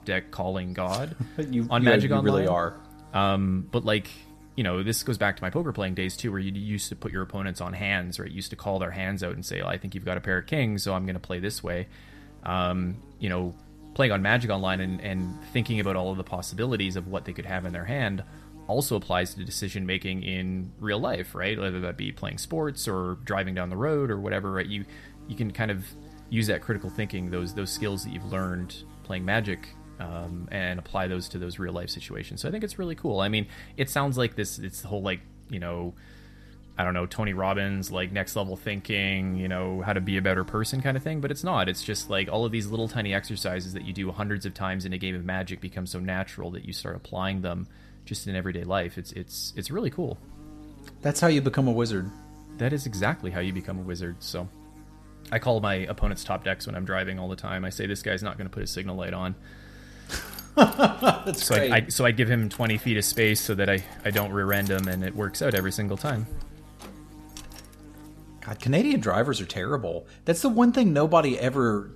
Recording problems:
electrical hum; faint; throughout; 50 Hz, 25 dB below the speech
jangling keys; noticeable; from 1:00 to 1:08; peak 6 dB below the speech

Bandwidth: 14 kHz